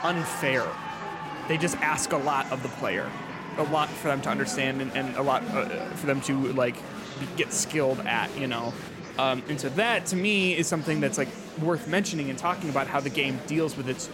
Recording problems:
murmuring crowd; loud; throughout; 9 dB below the speech

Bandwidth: 16 kHz